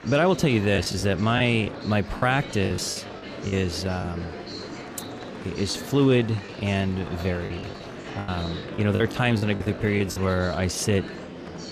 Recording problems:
murmuring crowd; noticeable; throughout; 10 dB below the speech
choppy; very; from 1 to 4 s and from 5.5 to 10 s; 11% of the speech affected

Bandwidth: 14 kHz